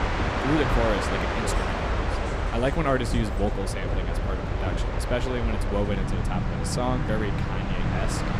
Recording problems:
train or aircraft noise; very loud; throughout; 2 dB above the speech

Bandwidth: 15.5 kHz